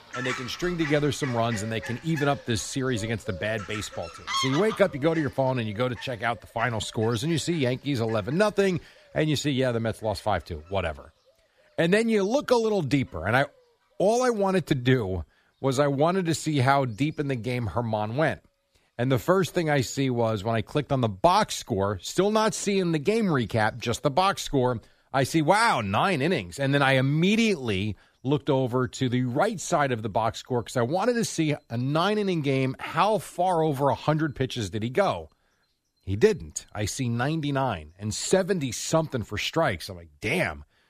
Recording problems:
animal sounds; noticeable; throughout; 10 dB below the speech

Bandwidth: 14.5 kHz